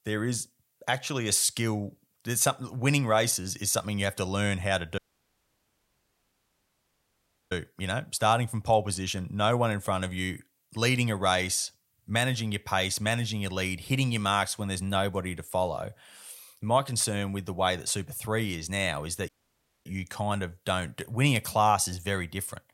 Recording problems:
audio cutting out; at 5 s for 2.5 s and at 19 s for 0.5 s

